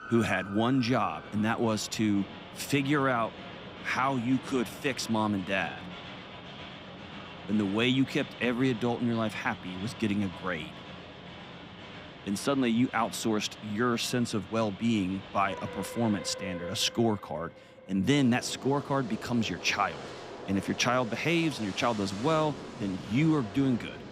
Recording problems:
train or aircraft noise; noticeable; throughout; 15 dB below the speech

